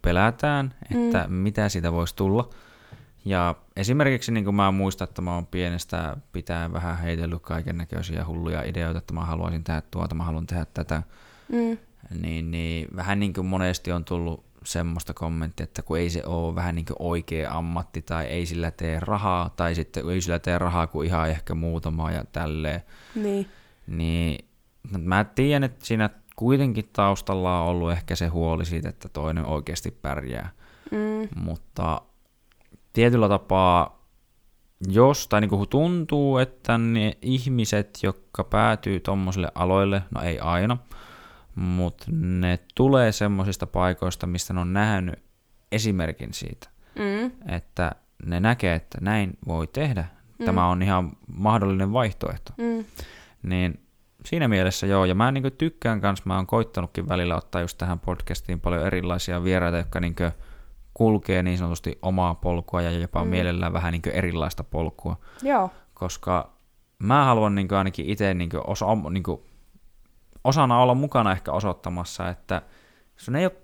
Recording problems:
none

